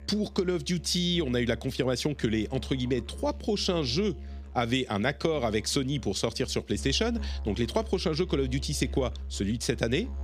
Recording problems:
background music; noticeable; throughout; 15 dB below the speech

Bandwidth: 14.5 kHz